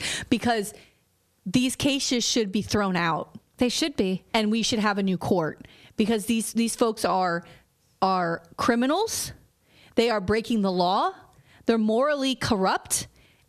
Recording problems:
squashed, flat; heavily

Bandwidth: 14 kHz